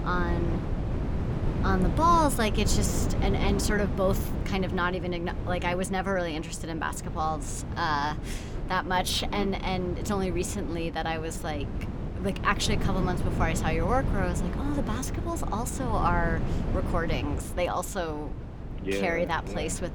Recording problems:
wind noise on the microphone; occasional gusts; 10 dB below the speech

